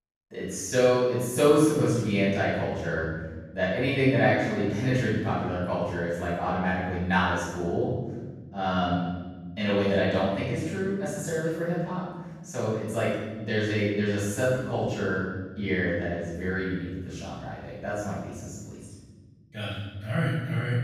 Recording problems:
room echo; strong; dies away in 1.5 s
off-mic speech; far

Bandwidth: 15 kHz